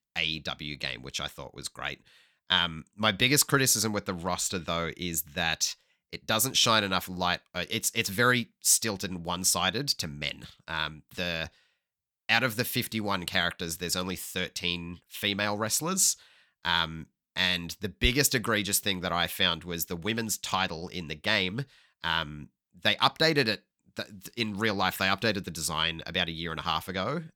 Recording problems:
none

